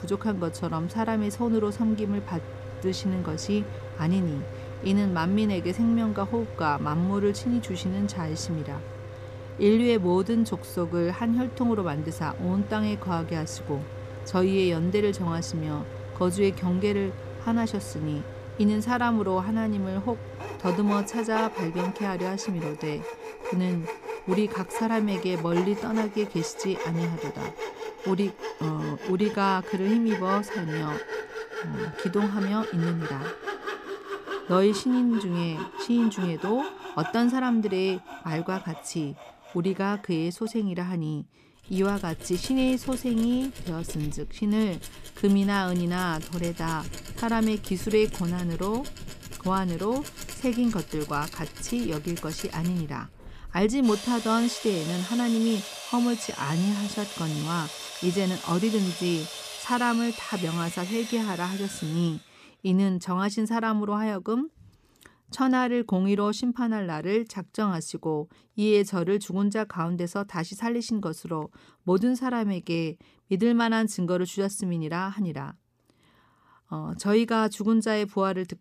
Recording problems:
machinery noise; noticeable; until 1:02; 10 dB below the speech

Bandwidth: 14.5 kHz